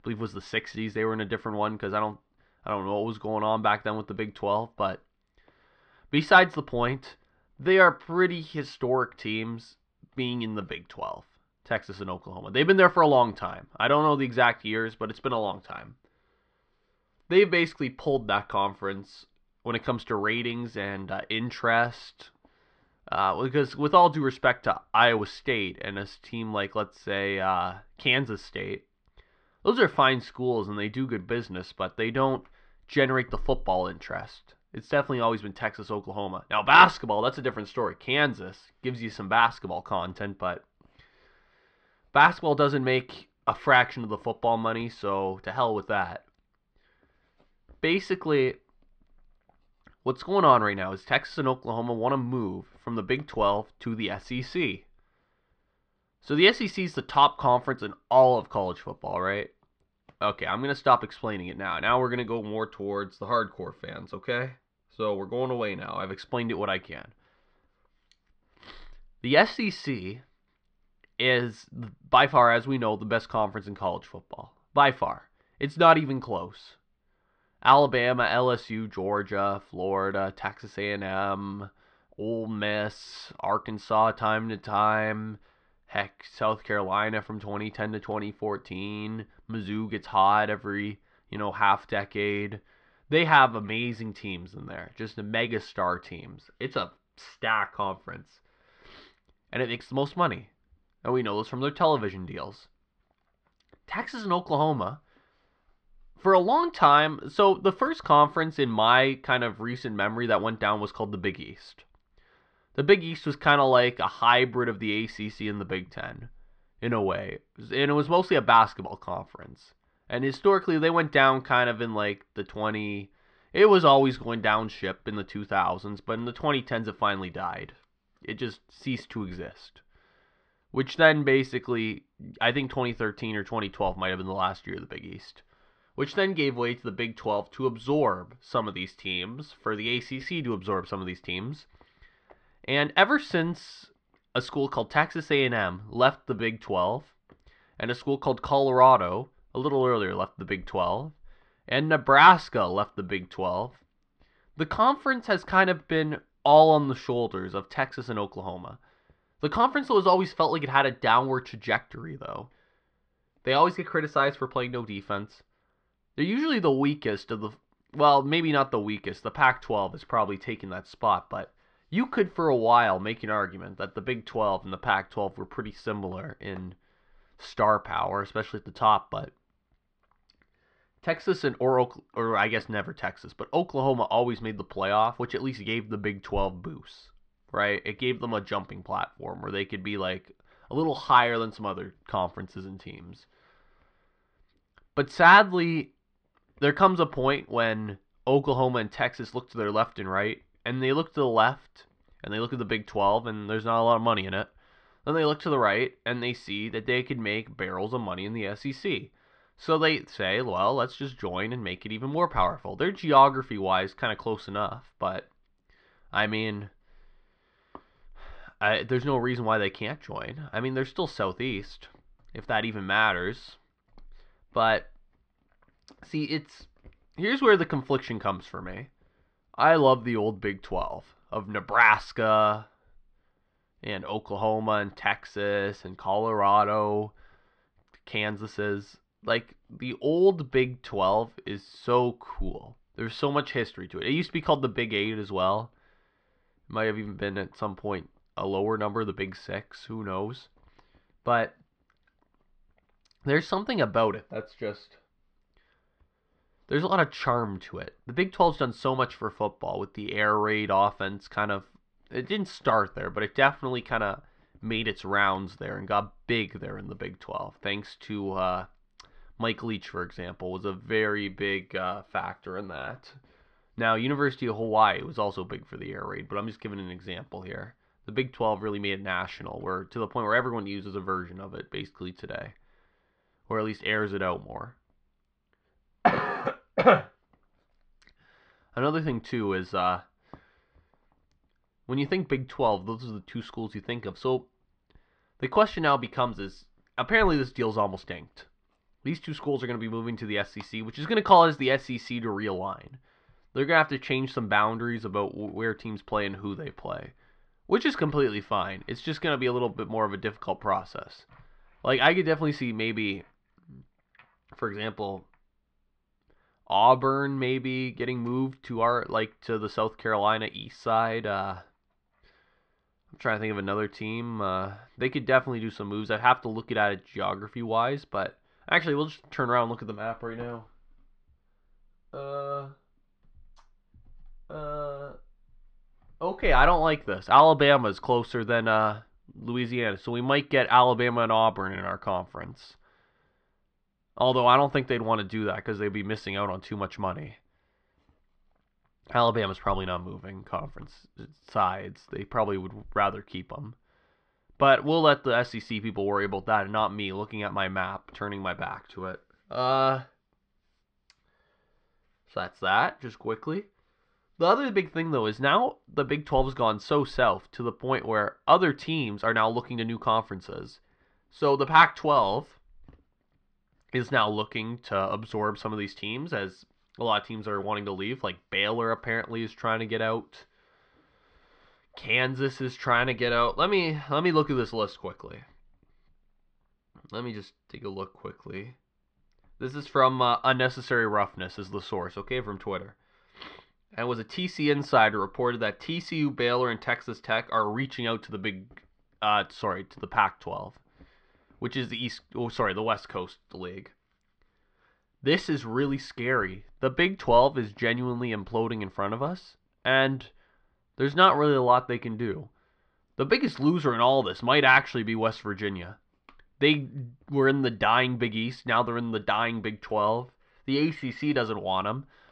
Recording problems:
muffled; slightly; fading above 4 kHz

